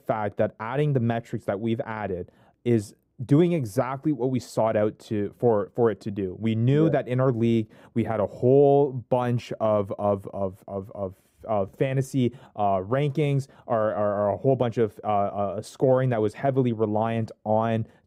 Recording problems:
muffled; slightly; fading above 1 kHz

